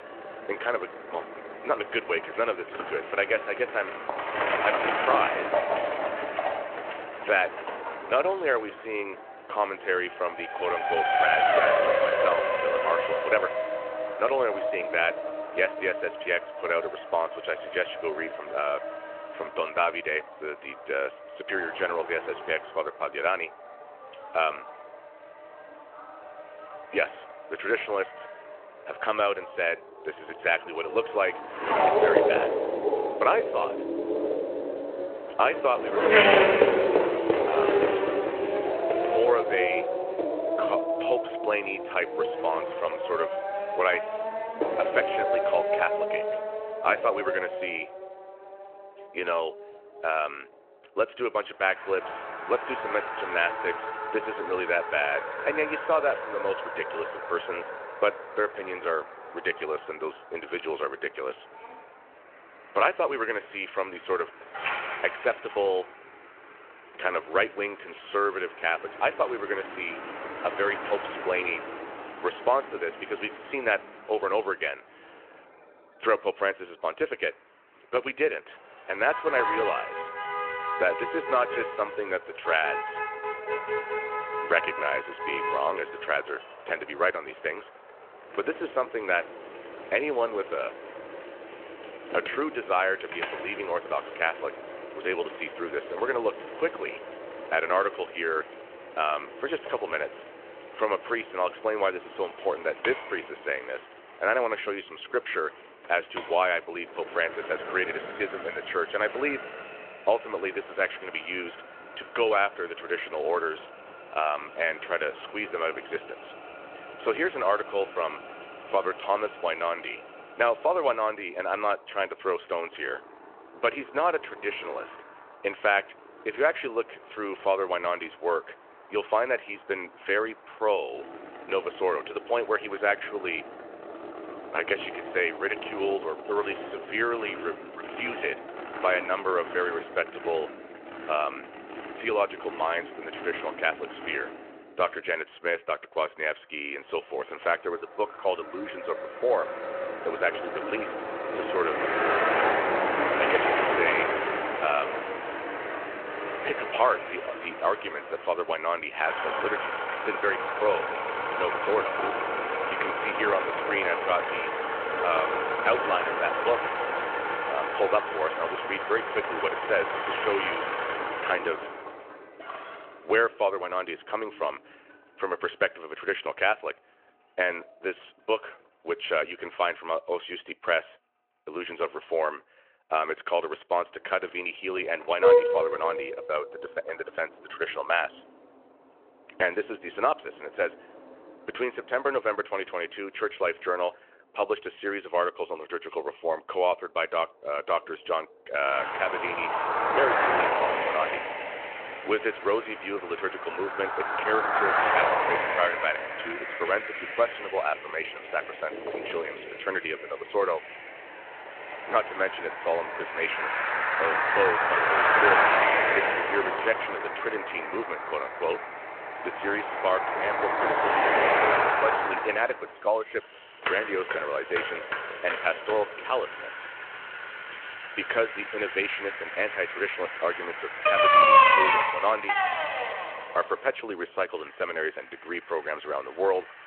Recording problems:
phone-call audio
traffic noise; very loud; throughout; 1 dB above the speech

